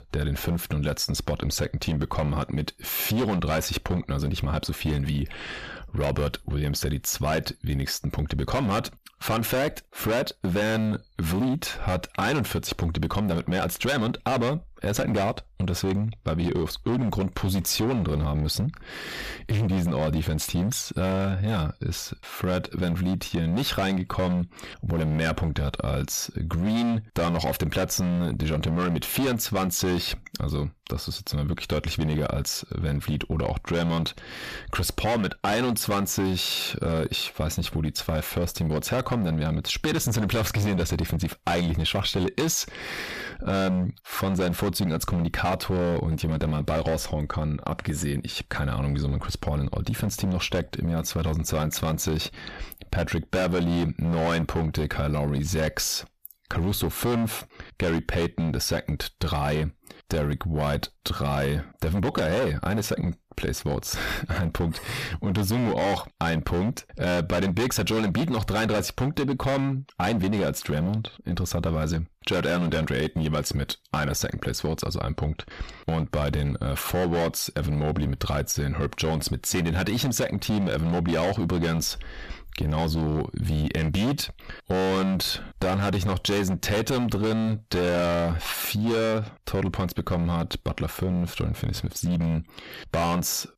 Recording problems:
distortion; heavy; 15% of the sound clipped
squashed, flat; somewhat

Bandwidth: 14.5 kHz